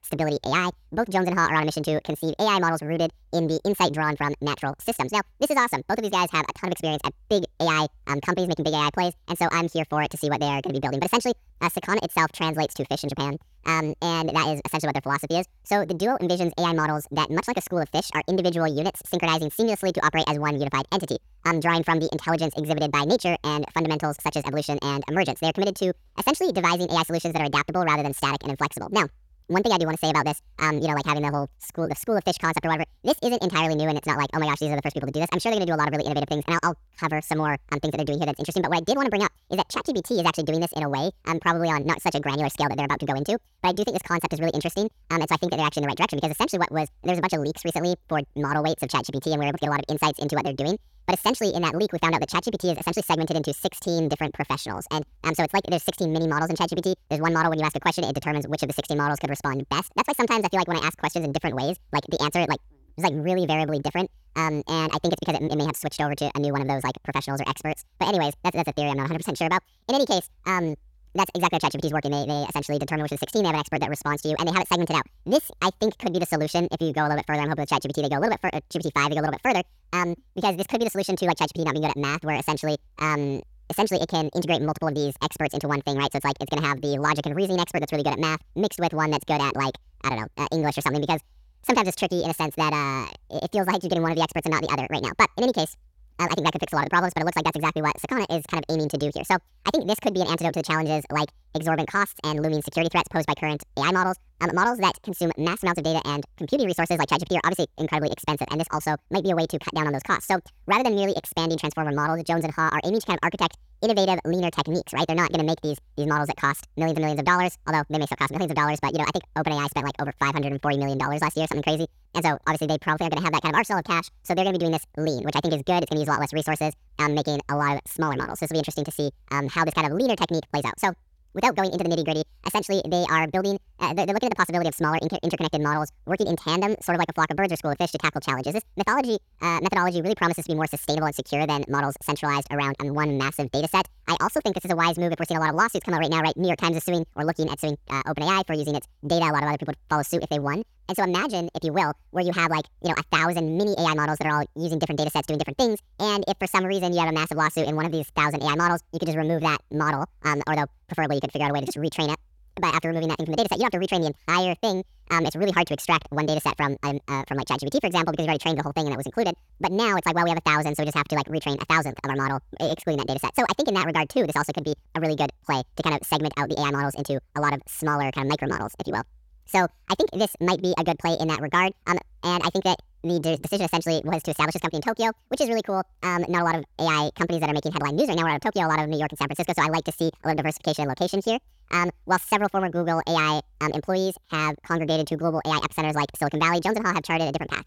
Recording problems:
wrong speed and pitch; too fast and too high; 1.7 times normal speed

